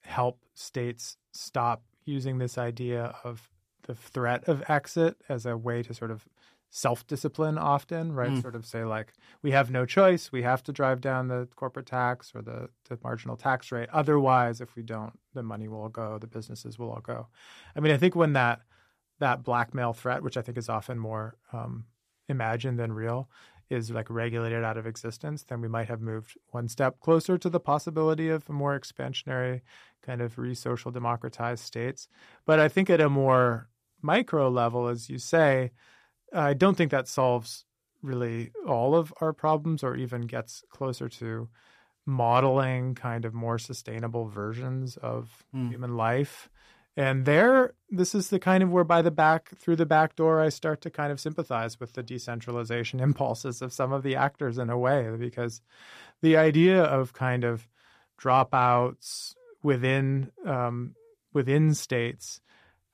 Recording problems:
none

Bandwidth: 14.5 kHz